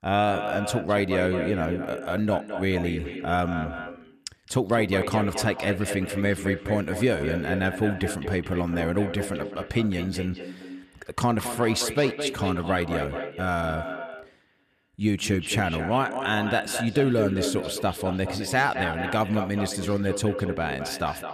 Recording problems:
echo of what is said; strong; throughout; 210 ms later, 7 dB below the speech

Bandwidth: 14.5 kHz